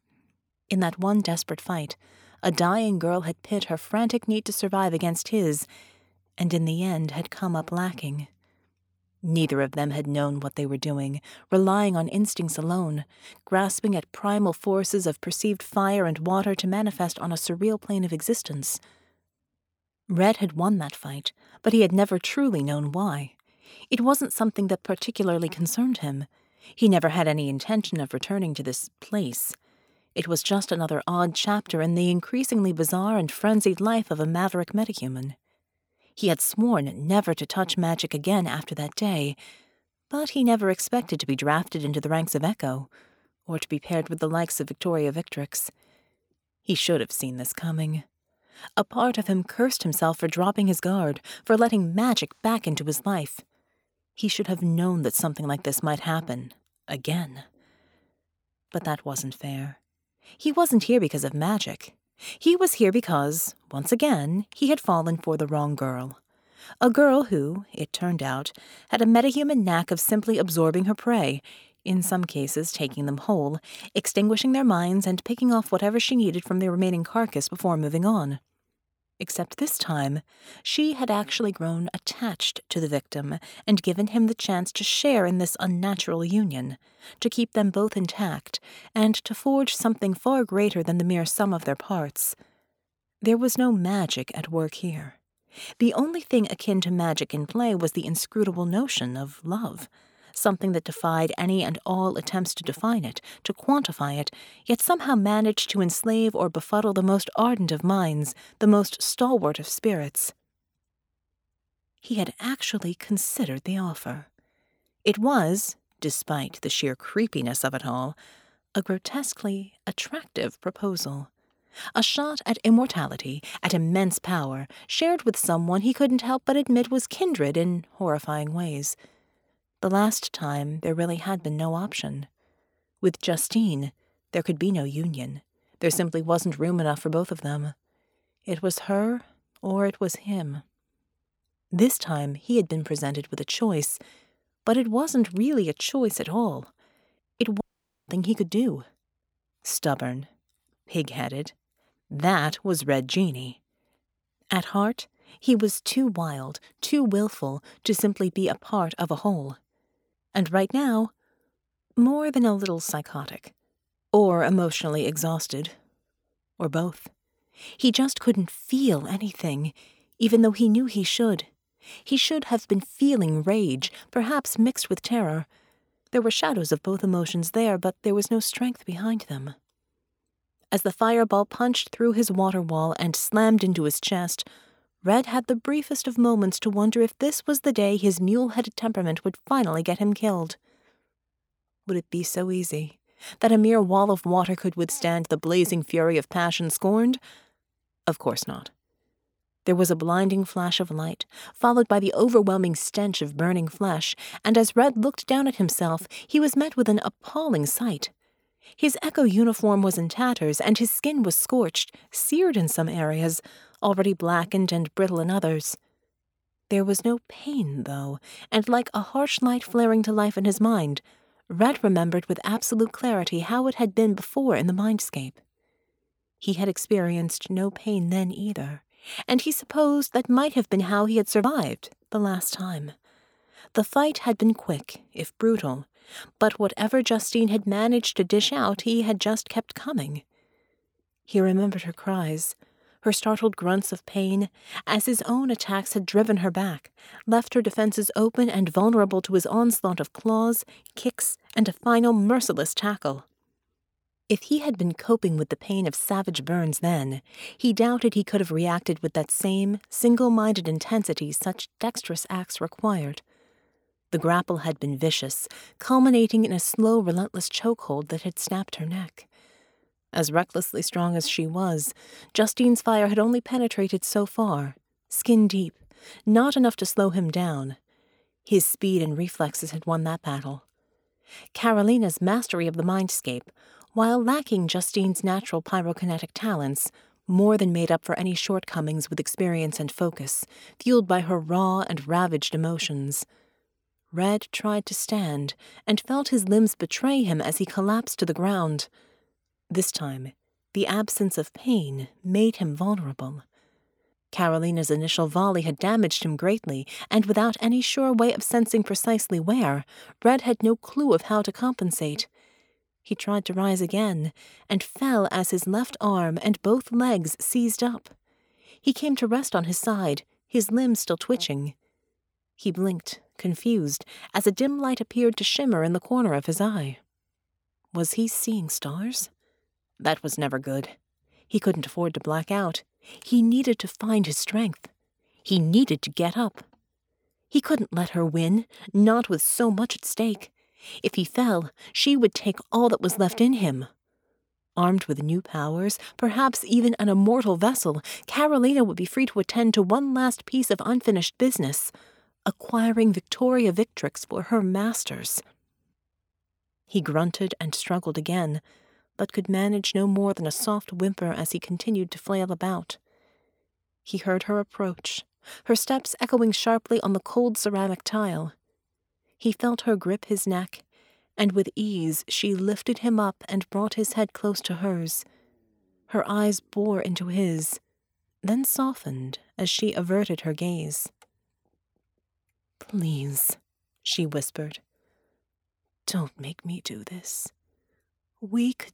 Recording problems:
audio cutting out; at 2:28

